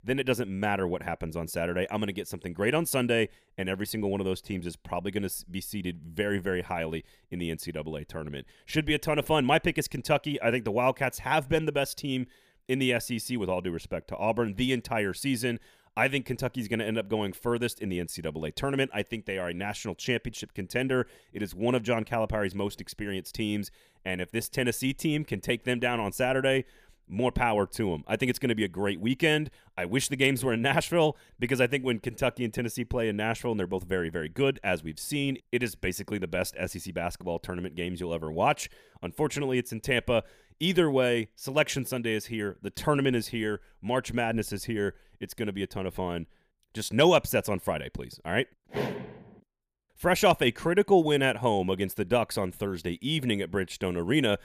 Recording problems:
none

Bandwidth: 15 kHz